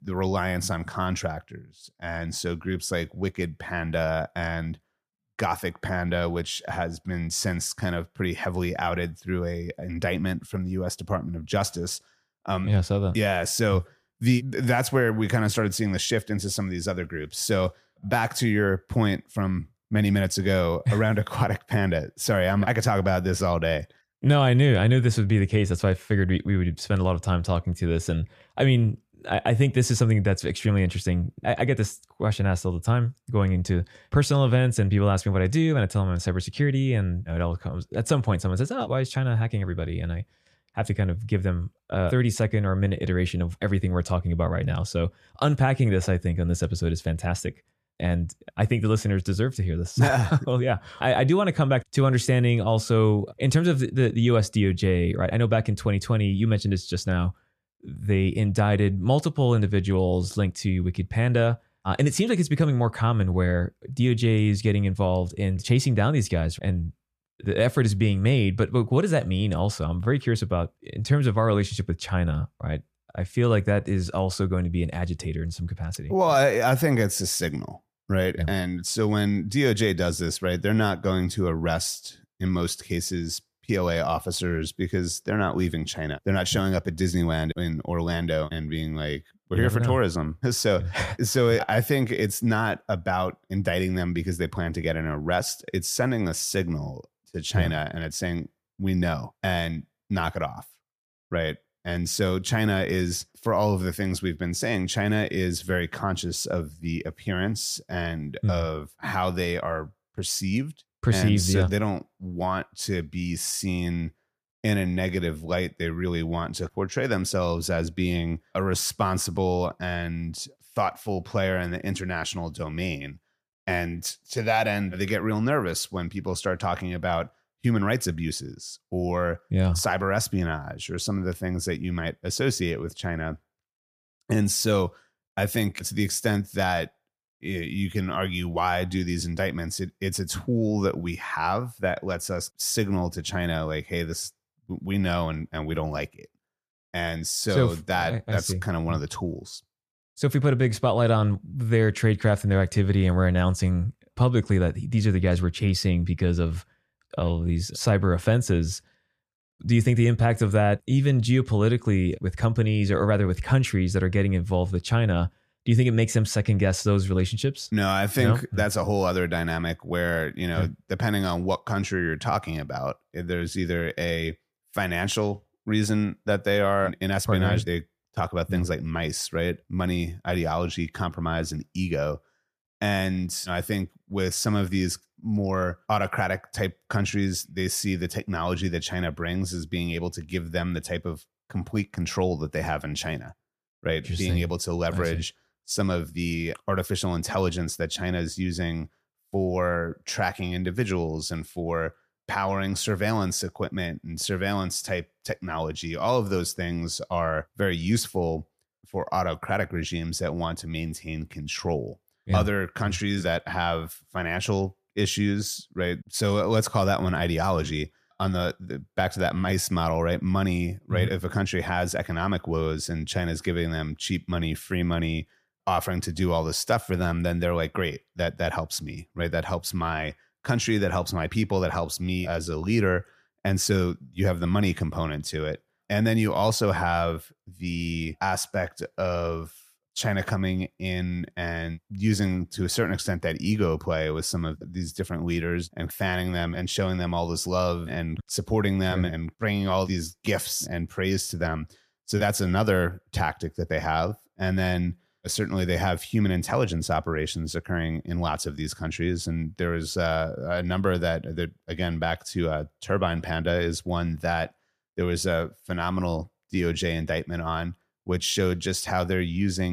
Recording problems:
abrupt cut into speech; at the end

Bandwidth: 14.5 kHz